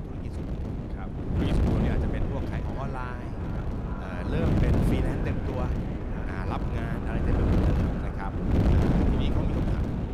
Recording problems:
echo of what is said; strong; throughout; 400 ms later, 9 dB below the speech
wind noise on the microphone; heavy; 4 dB above the speech

